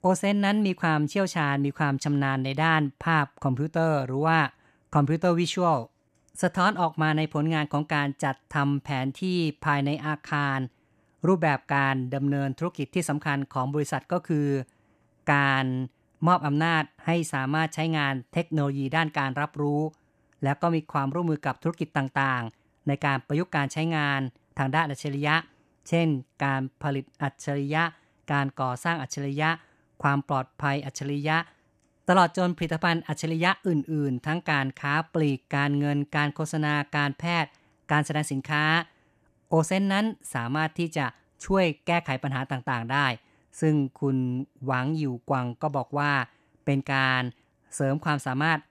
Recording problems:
none

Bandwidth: 14.5 kHz